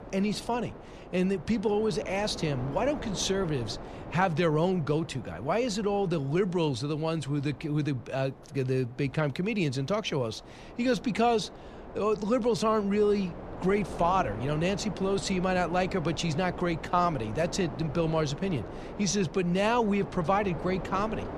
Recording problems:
wind noise on the microphone; occasional gusts; 15 dB below the speech

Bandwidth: 14.5 kHz